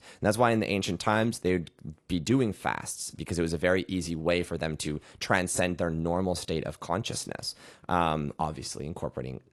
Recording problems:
garbled, watery; slightly; nothing above 11.5 kHz

